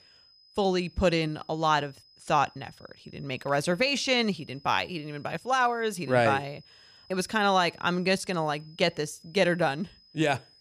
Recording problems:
high-pitched whine; faint; throughout; 5 kHz, 30 dB below the speech

